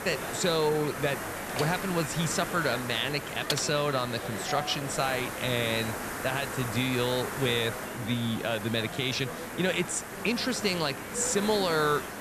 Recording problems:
hiss; loud; throughout; 8 dB below the speech
murmuring crowd; noticeable; throughout; 10 dB below the speech
door banging; noticeable; at 1.5 s; peak 8 dB below the speech
keyboard typing; noticeable; at 3.5 s; peak 4 dB below the speech
doorbell; noticeable; at 4.5 s; peak 8 dB below the speech

